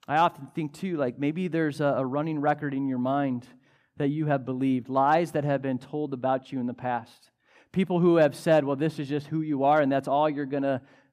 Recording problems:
none

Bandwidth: 15 kHz